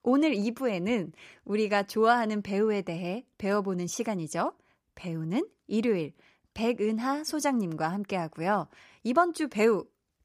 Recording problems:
none

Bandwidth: 15 kHz